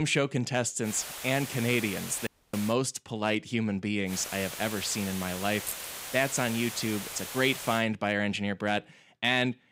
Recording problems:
hiss; loud; from 1 to 2.5 s and from 4 to 8 s; 8 dB below the speech
abrupt cut into speech; at the start
audio cutting out; at 2.5 s
jangling keys; noticeable; at 5.5 s; peak 8 dB below the speech

